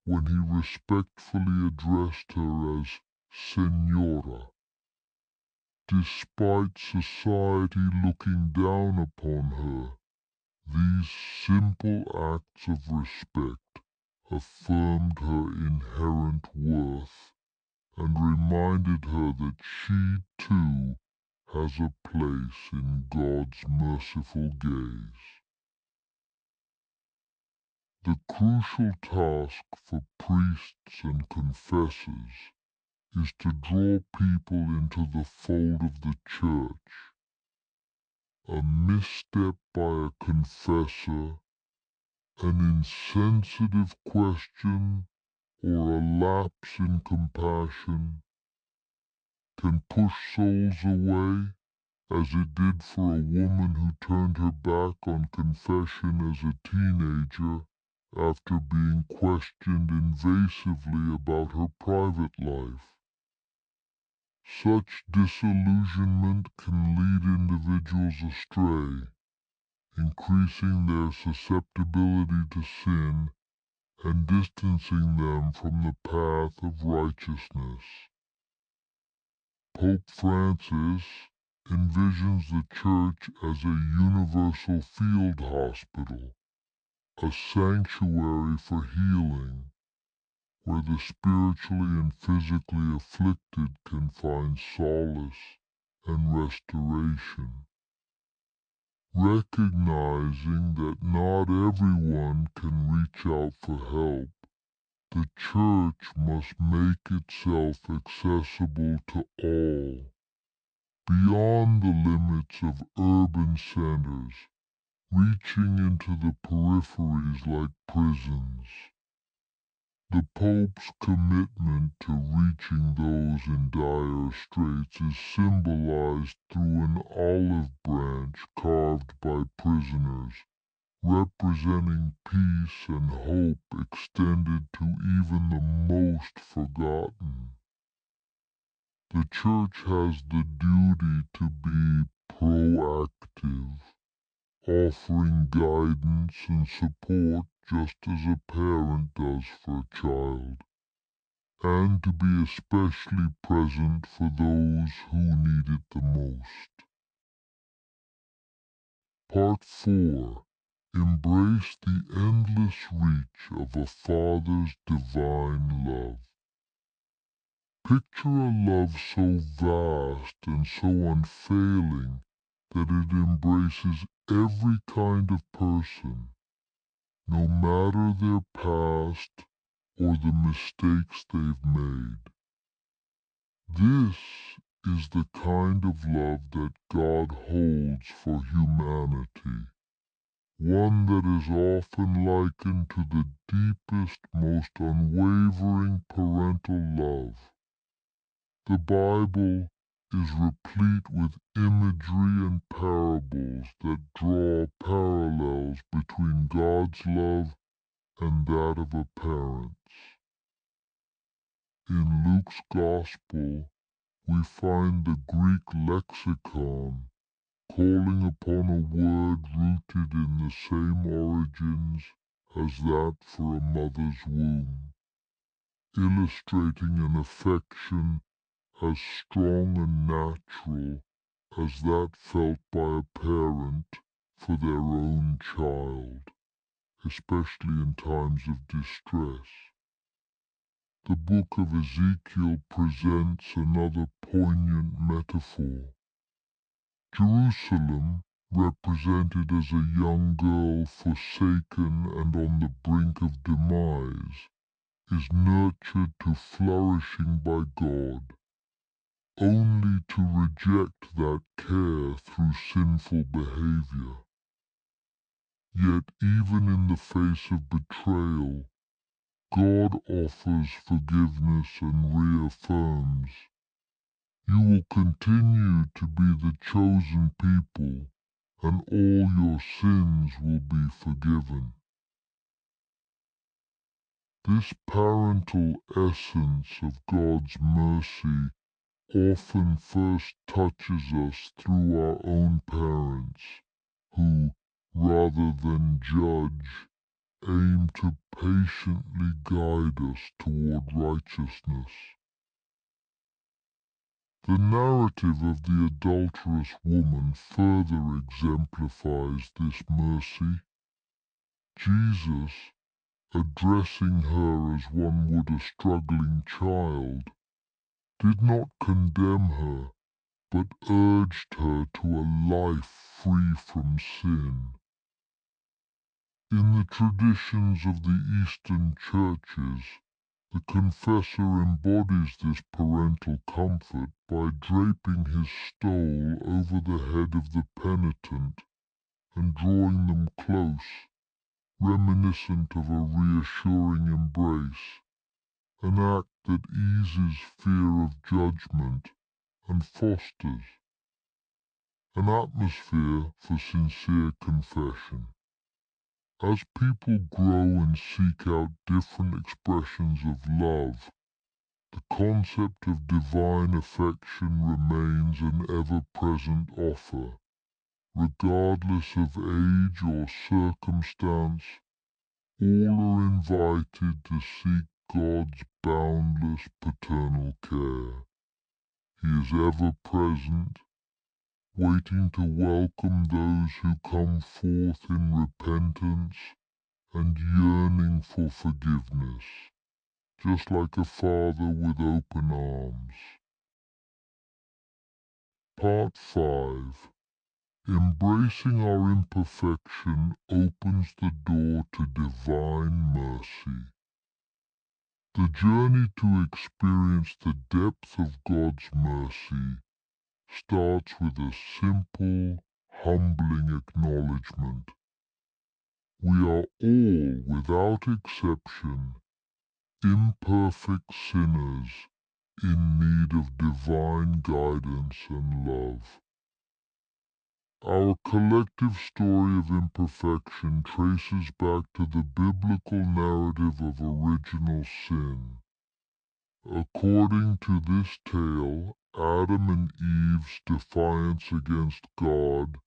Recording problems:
wrong speed and pitch; too slow and too low; 0.6 times normal speed

